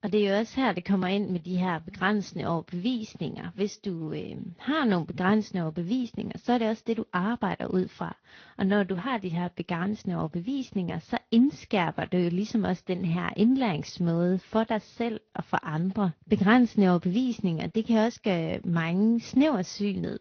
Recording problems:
high frequencies cut off; noticeable; nothing above 6 kHz
garbled, watery; slightly

